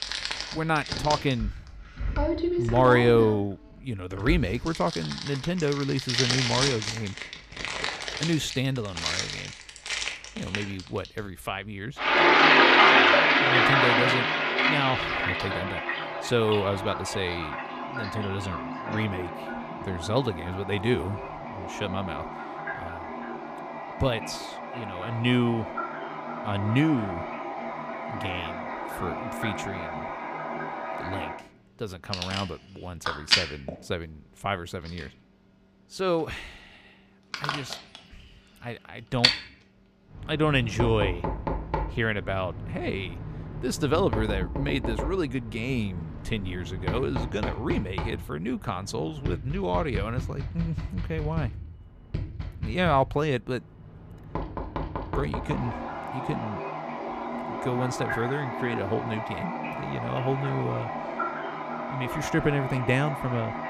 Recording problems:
household noises; very loud; throughout; 1 dB above the speech

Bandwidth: 15 kHz